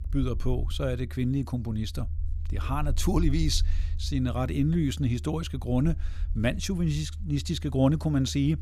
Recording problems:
low rumble; faint; throughout; 20 dB below the speech

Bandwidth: 15.5 kHz